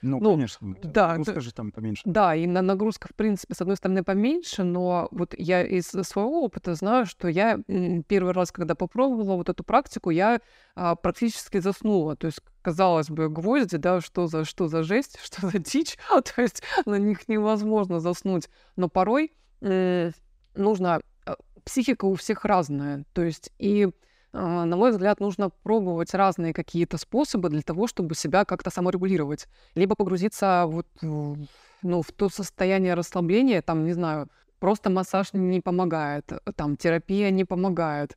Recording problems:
uneven, jittery; strongly; from 0.5 to 33 s

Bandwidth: 15.5 kHz